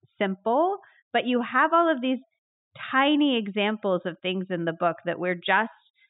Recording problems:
high frequencies cut off; severe; nothing above 4 kHz

